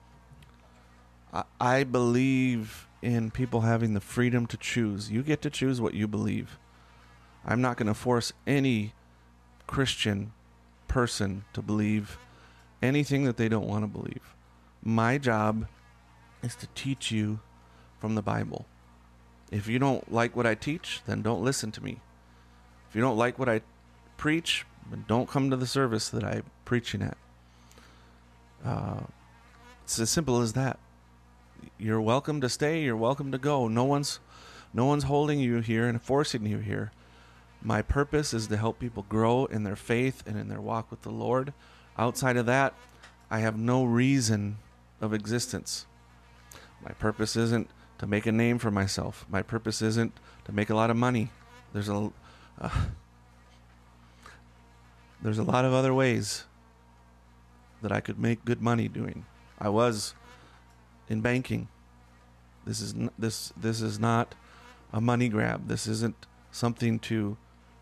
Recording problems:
electrical hum; faint; throughout; 60 Hz, 30 dB below the speech

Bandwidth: 13.5 kHz